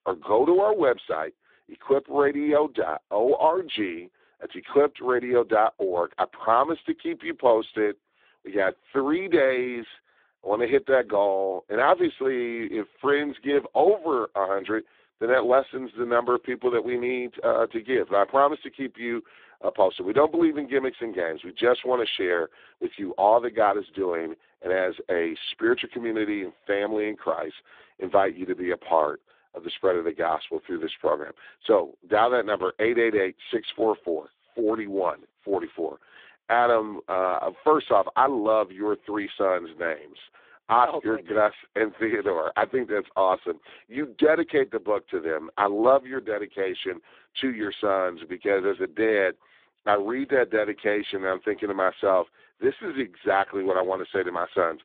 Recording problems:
phone-call audio; poor line; nothing above 3.5 kHz

